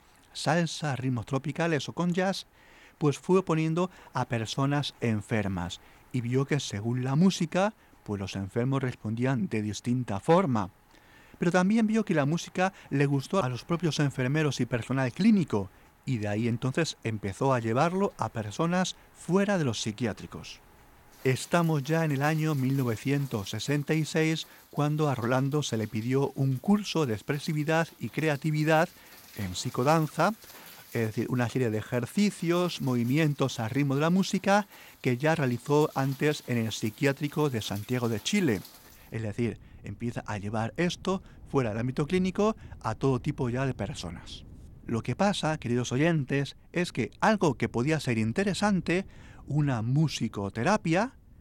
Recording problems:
rain or running water; faint; throughout; 25 dB below the speech

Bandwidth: 17.5 kHz